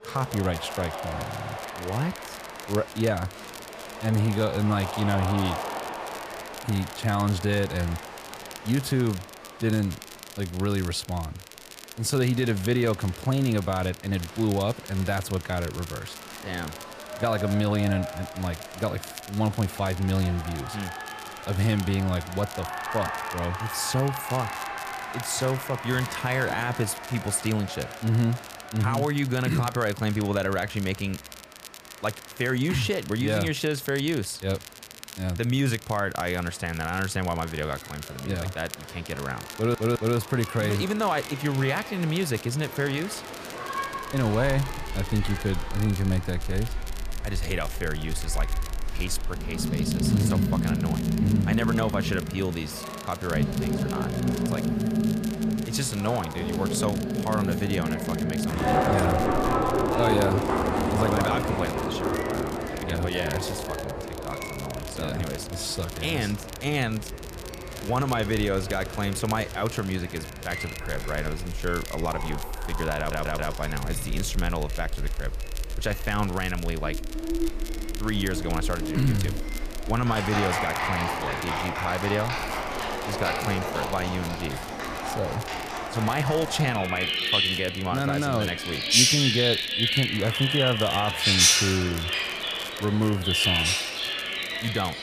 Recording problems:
animal sounds; very loud; from 44 s on; as loud as the speech
crowd noise; noticeable; throughout; 10 dB below the speech
crackle, like an old record; noticeable; 15 dB below the speech
household noises; faint; throughout; 20 dB below the speech
audio stuttering; at 1.5 s, at 40 s and at 1:13

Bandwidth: 14.5 kHz